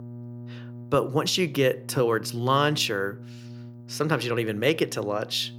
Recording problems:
electrical hum; faint; throughout; 60 Hz, 25 dB below the speech

